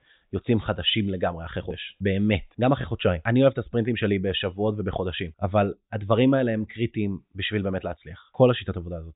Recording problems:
high frequencies cut off; severe; nothing above 4 kHz

